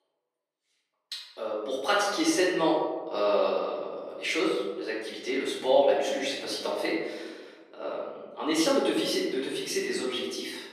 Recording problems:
off-mic speech; far
thin; very; fading below 350 Hz
room echo; noticeable; dies away in 1.2 s

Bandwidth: 14.5 kHz